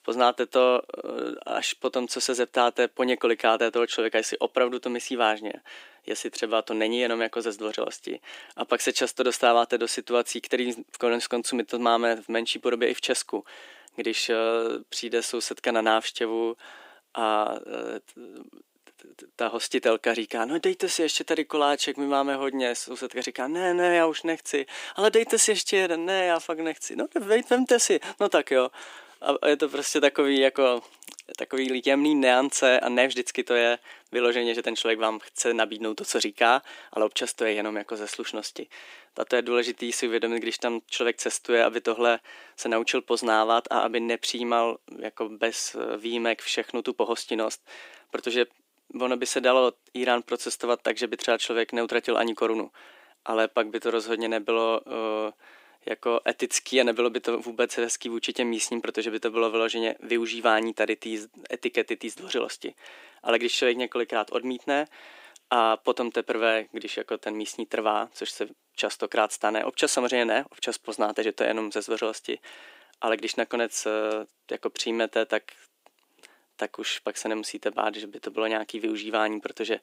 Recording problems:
thin; somewhat; fading below 300 Hz

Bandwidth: 15.5 kHz